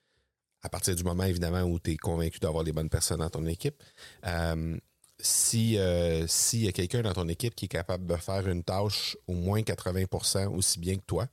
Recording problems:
uneven, jittery; strongly; from 0.5 to 9.5 s

